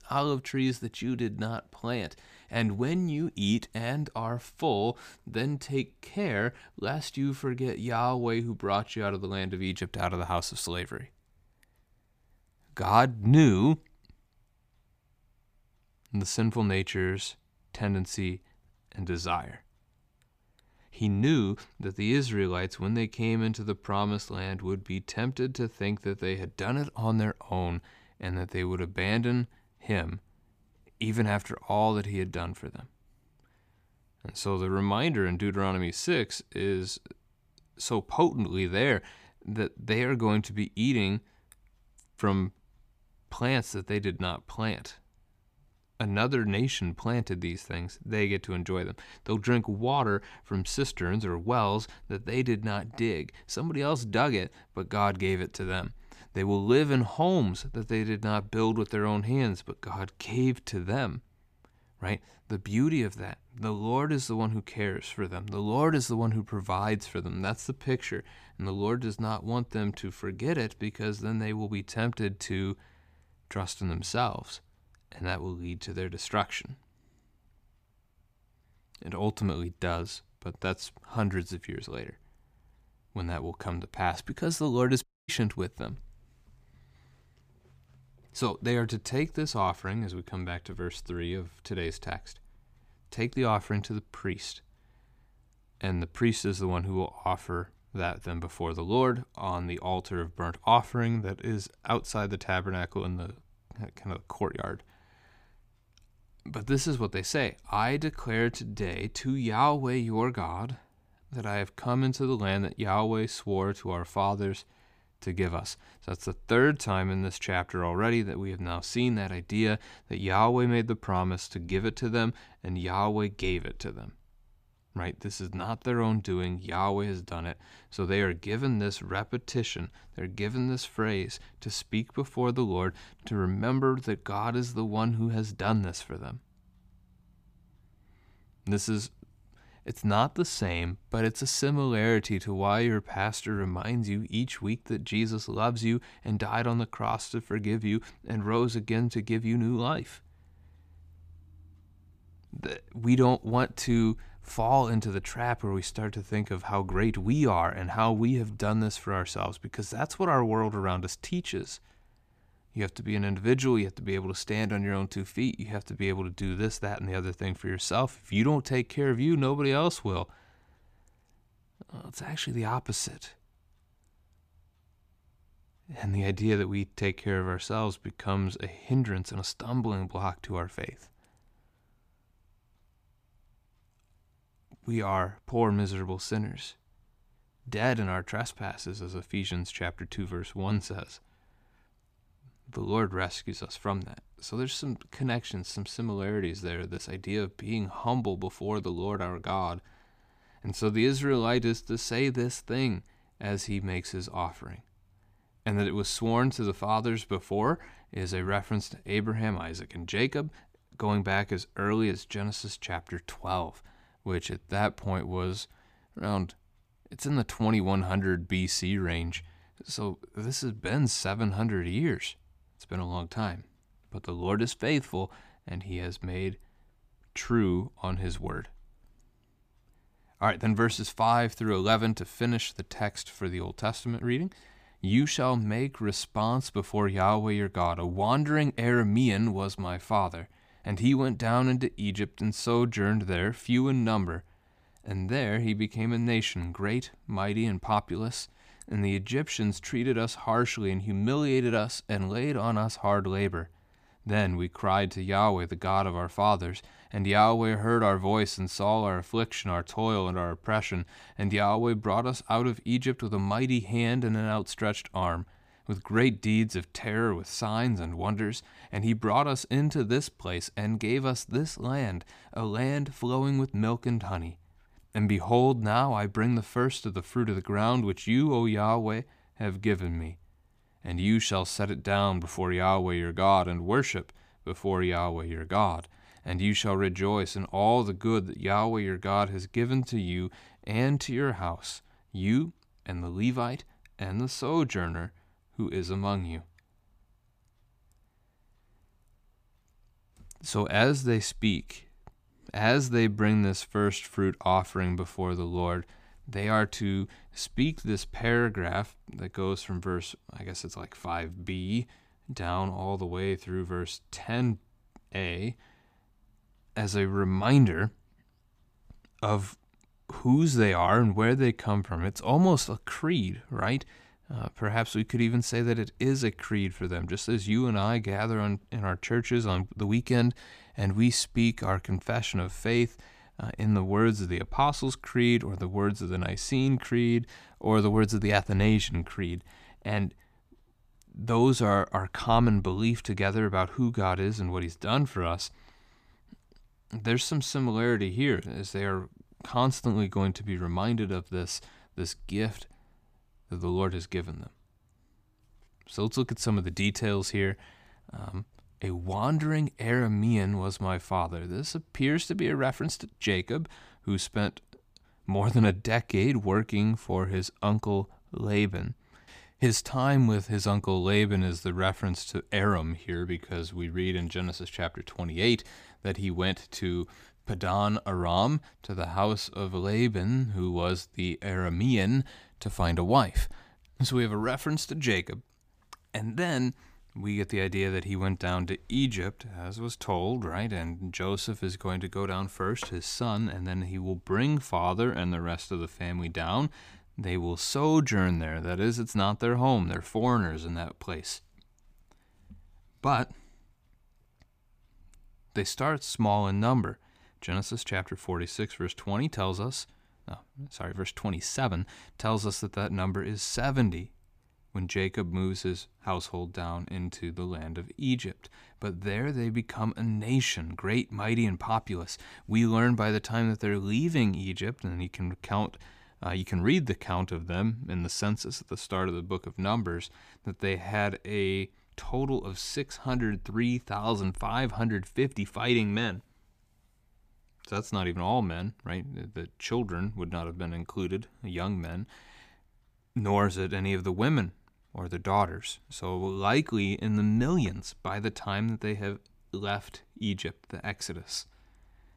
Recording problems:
audio cutting out; at 1:25

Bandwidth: 15 kHz